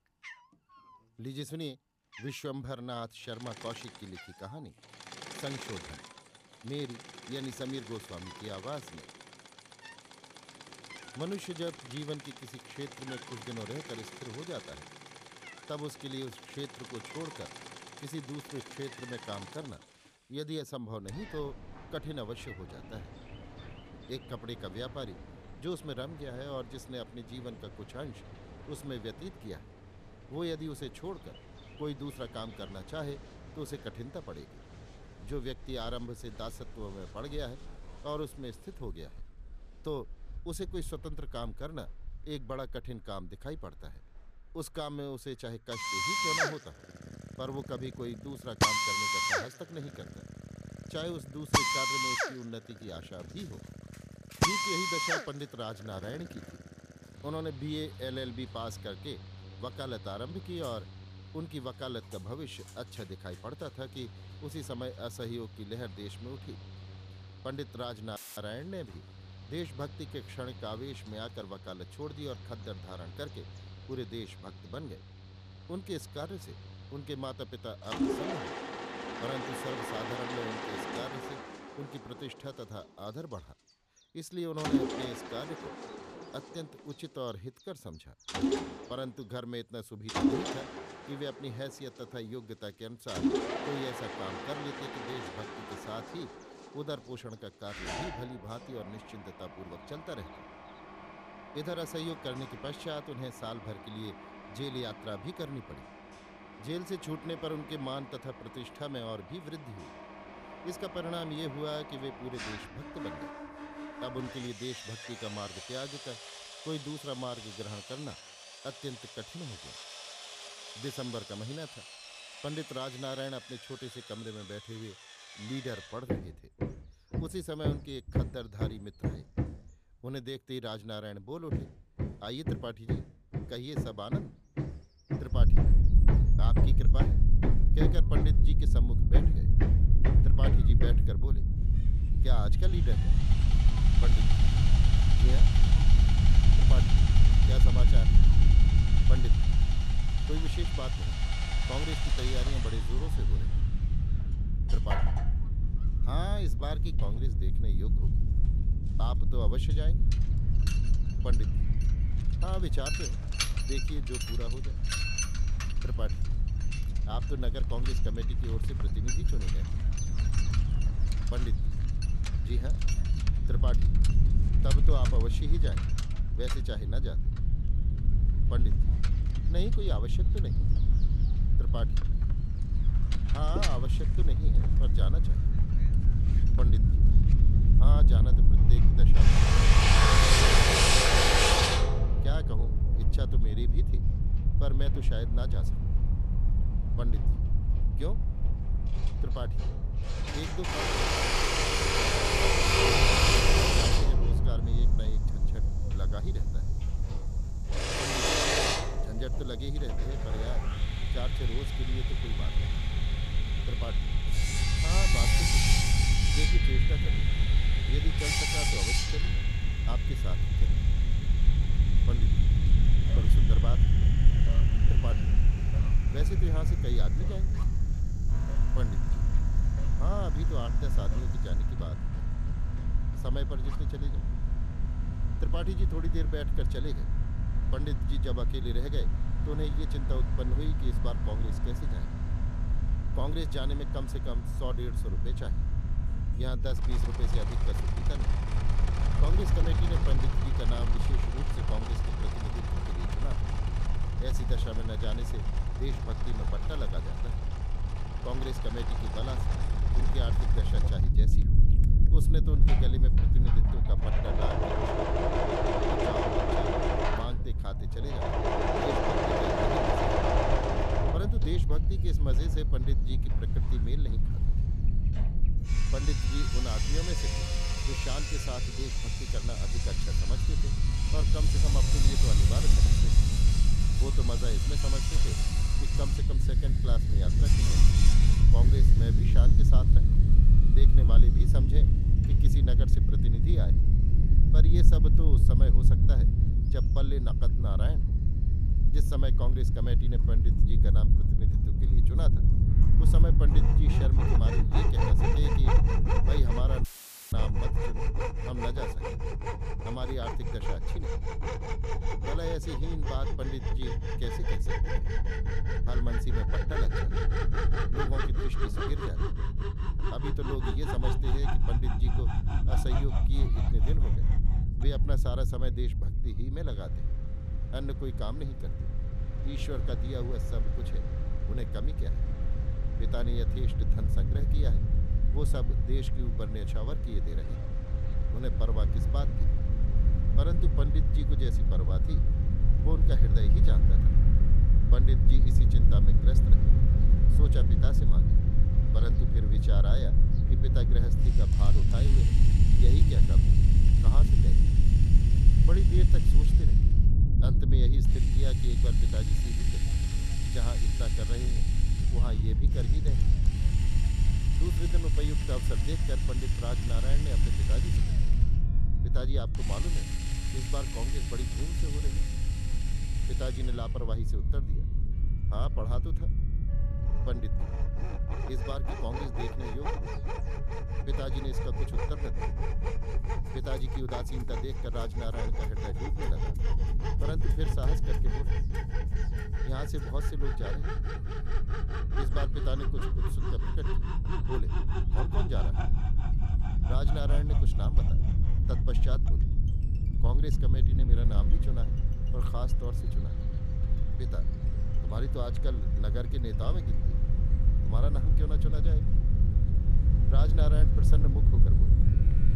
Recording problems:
machinery noise; very loud; throughout; 5 dB above the speech
low rumble; loud; from 2:15 on; 3 dB below the speech
background music; noticeable; from 3:20 on; 20 dB below the speech
animal sounds; faint; throughout; 20 dB below the speech
audio cutting out; filled with static; at 1:08 and at 5:07

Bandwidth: 14.5 kHz